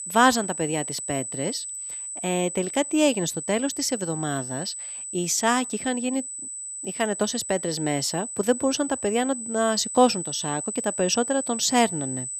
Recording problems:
high-pitched whine; loud; throughout; 8 kHz, 6 dB below the speech

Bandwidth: 14.5 kHz